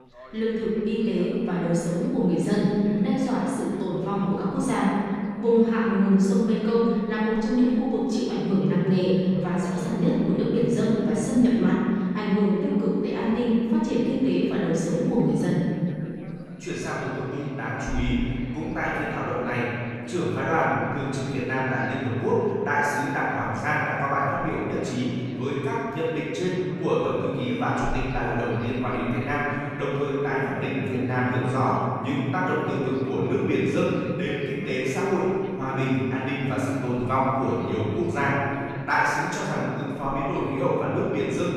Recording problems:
room echo; strong; dies away in 2.3 s
off-mic speech; far
background chatter; faint; throughout; 3 voices, 20 dB below the speech

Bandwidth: 14 kHz